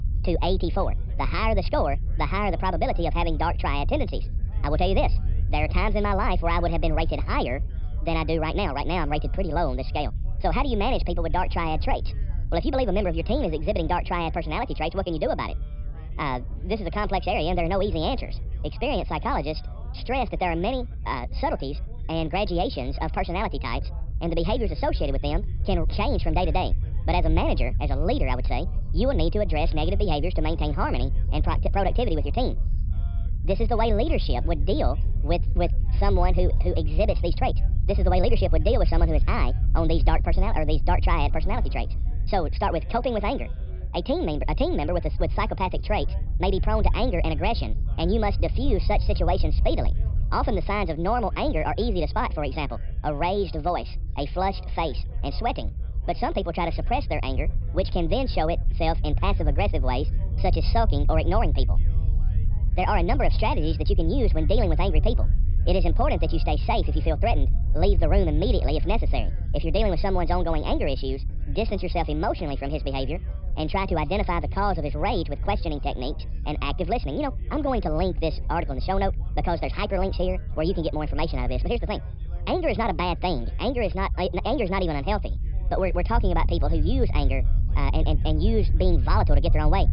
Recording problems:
wrong speed and pitch; too fast and too high; 1.6 times normal speed
high frequencies cut off; noticeable; nothing above 5.5 kHz
background chatter; faint; throughout; 4 voices, 25 dB below the speech
low rumble; faint; throughout; 20 dB below the speech

